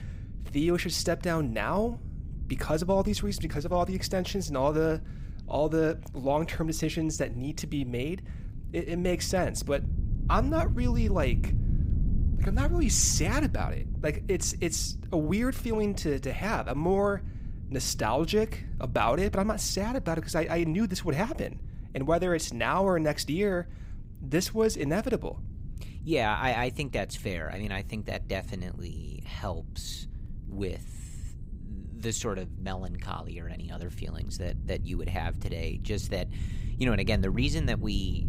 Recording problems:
low rumble; noticeable; throughout; 20 dB below the speech

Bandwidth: 15.5 kHz